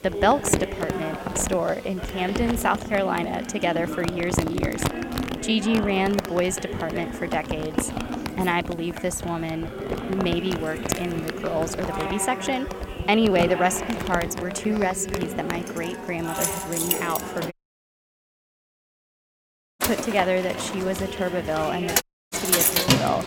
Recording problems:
household noises; loud; throughout; 3 dB below the speech
background chatter; loud; throughout; 4 voices, 8 dB below the speech
electrical hum; noticeable; throughout; 50 Hz, 20 dB below the speech
audio cutting out; at 18 s for 2.5 s and at 22 s

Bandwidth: 16.5 kHz